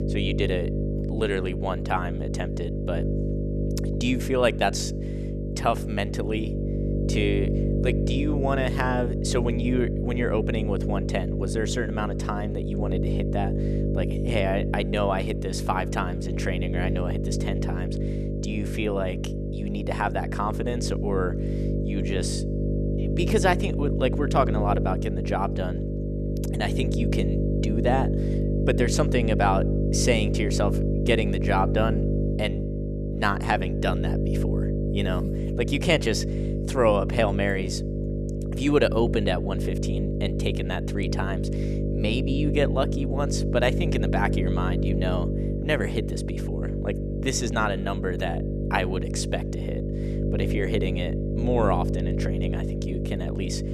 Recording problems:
electrical hum; loud; throughout; 50 Hz, 6 dB below the speech

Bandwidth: 14 kHz